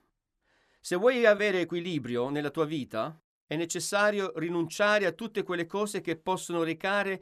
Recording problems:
none

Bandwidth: 14.5 kHz